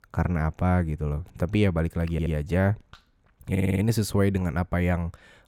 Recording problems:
audio stuttering; at 2 s and at 3.5 s

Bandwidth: 17 kHz